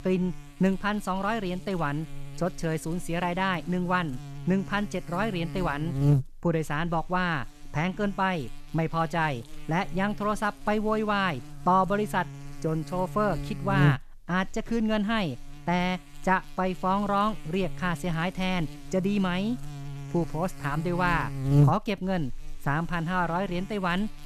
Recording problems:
electrical hum; noticeable; throughout; 60 Hz, 15 dB below the speech

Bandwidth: 14 kHz